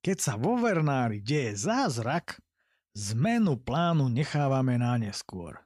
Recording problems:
none

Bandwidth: 15 kHz